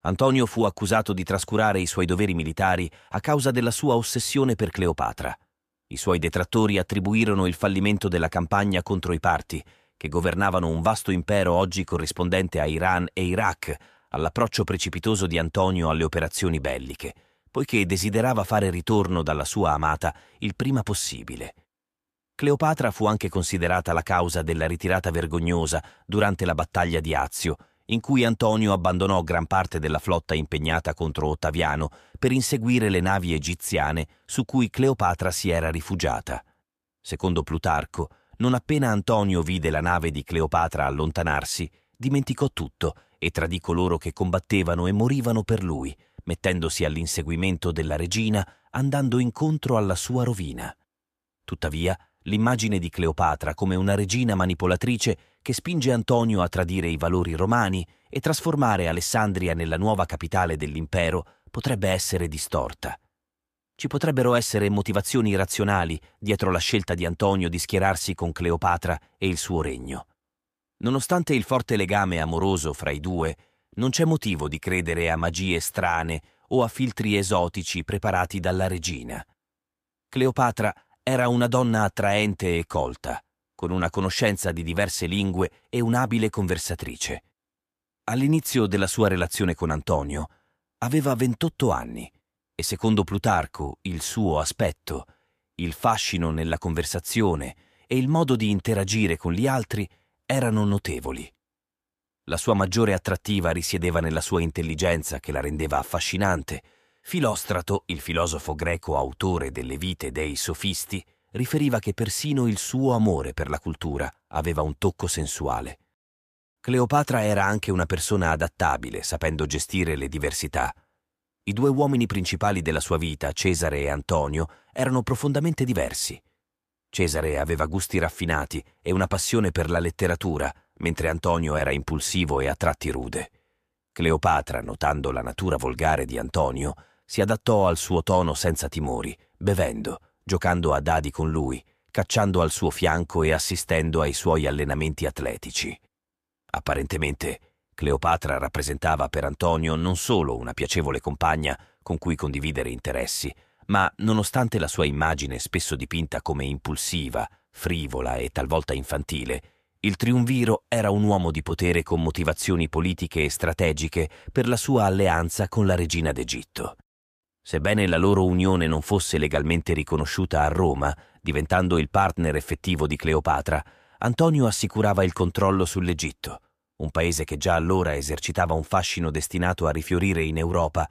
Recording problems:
none

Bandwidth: 14.5 kHz